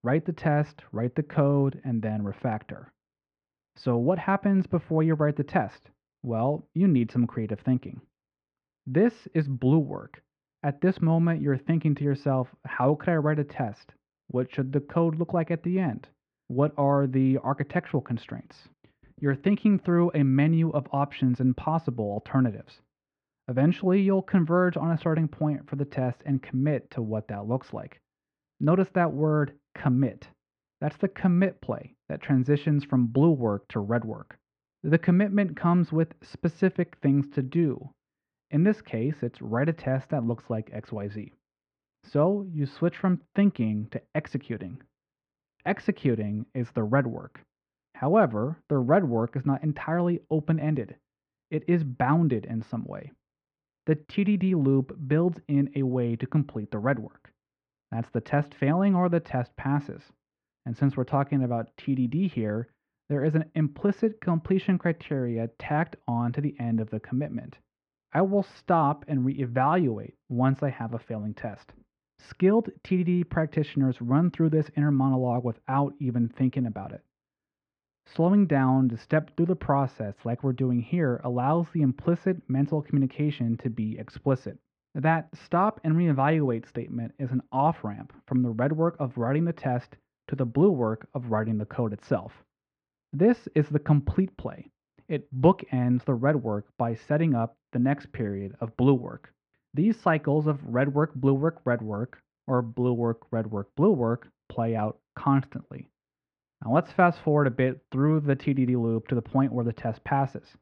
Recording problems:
muffled; very; fading above 2 kHz

